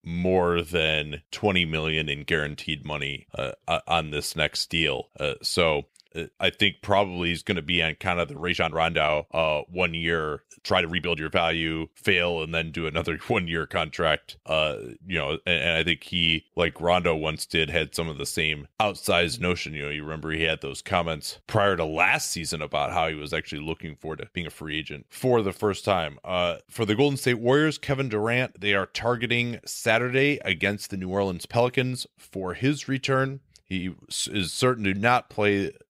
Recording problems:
uneven, jittery; strongly; from 8.5 to 32 s

